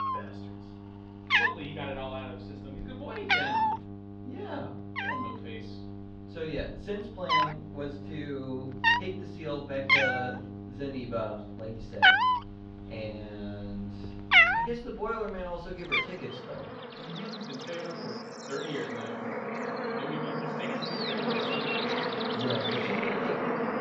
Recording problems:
off-mic speech; far
muffled; slightly; fading above 3.5 kHz
room echo; slight; dies away in 0.4 s
animal sounds; very loud; throughout; 10 dB above the speech
electrical hum; loud; until 15 s; 50 Hz, 10 dB below the speech

